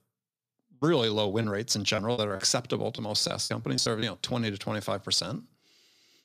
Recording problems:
choppy; very; from 1.5 to 4 s; 14% of the speech affected

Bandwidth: 14.5 kHz